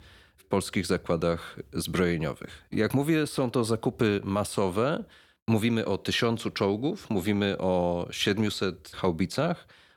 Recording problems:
none

